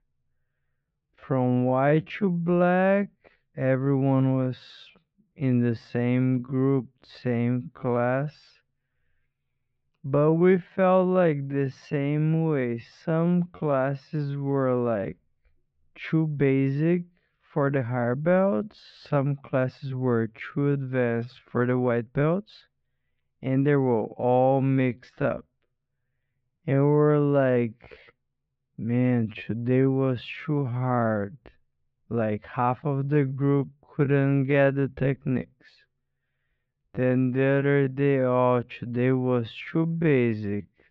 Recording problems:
muffled; very; fading above 3 kHz
wrong speed, natural pitch; too slow; 0.5 times normal speed
uneven, jittery; strongly; from 3 to 38 s

